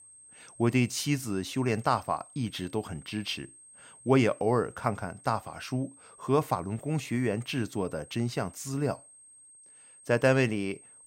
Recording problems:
high-pitched whine; faint; throughout; 8.5 kHz, 20 dB below the speech

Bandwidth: 16 kHz